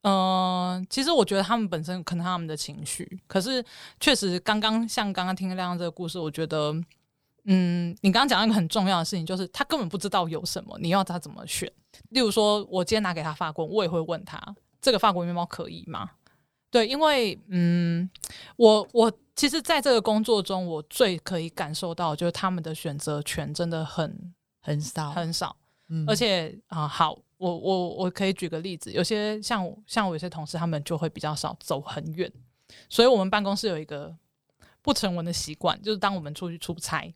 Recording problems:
none

